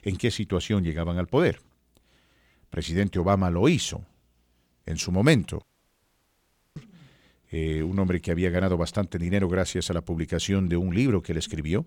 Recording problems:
audio cutting out; at 5.5 s for 1 s

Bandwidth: 18 kHz